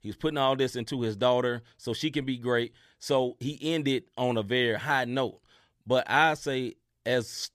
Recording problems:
none

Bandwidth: 14.5 kHz